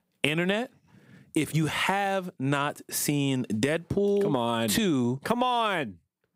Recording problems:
squashed, flat; heavily

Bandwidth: 15.5 kHz